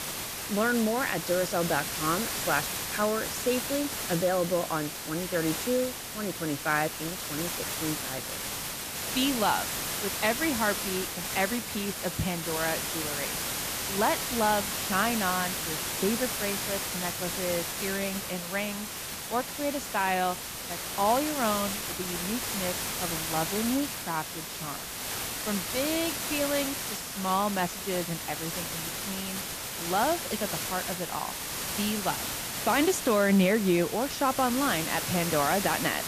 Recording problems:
hiss; loud; throughout; 2 dB below the speech

